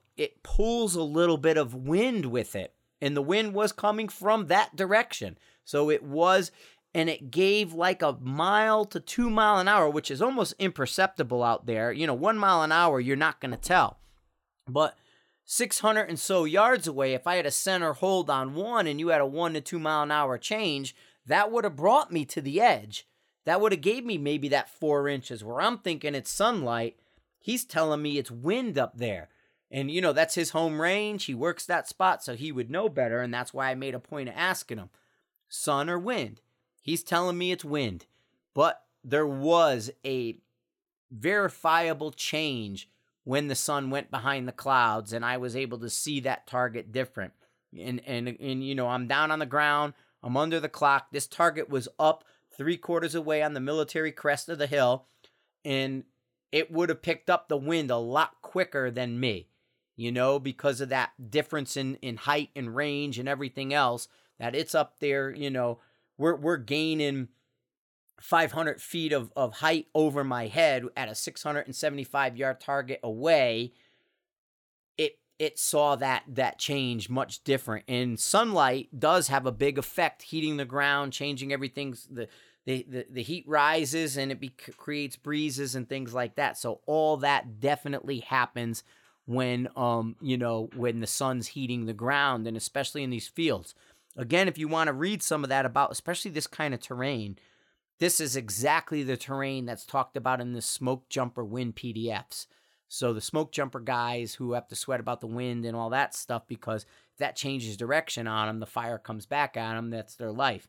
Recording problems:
none

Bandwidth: 17 kHz